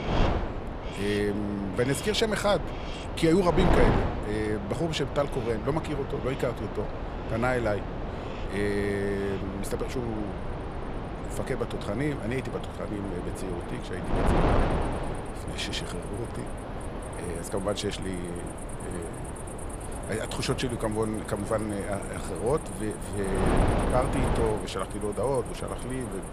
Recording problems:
wind noise on the microphone; heavy; 4 dB below the speech
animal sounds; noticeable; throughout; 15 dB below the speech

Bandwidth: 15 kHz